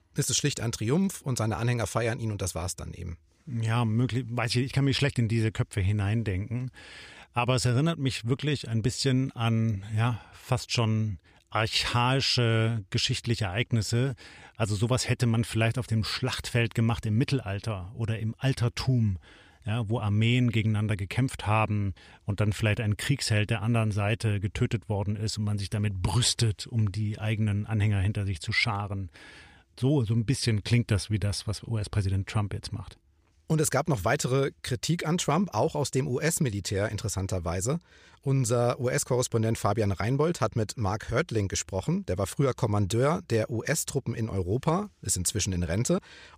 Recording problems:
none

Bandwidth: 14.5 kHz